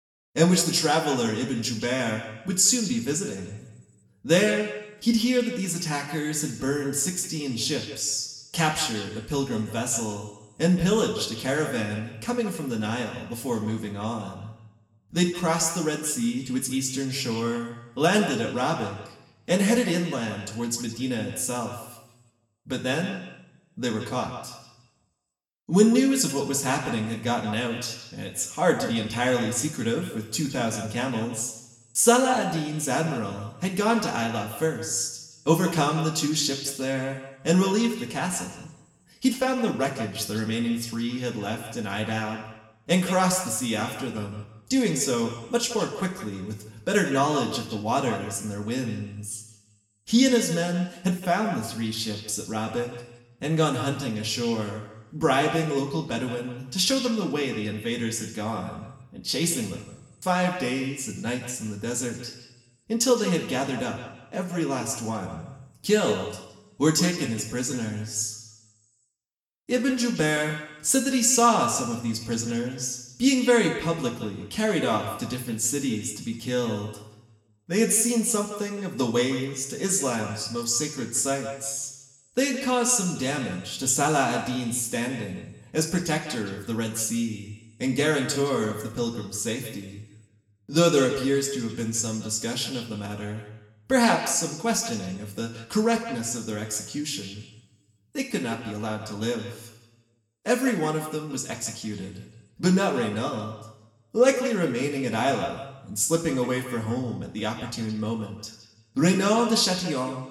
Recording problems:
echo of what is said; noticeable; throughout; 170 ms later, 10 dB below the speech
room echo; slight; dies away in 0.7 s
off-mic speech; somewhat distant

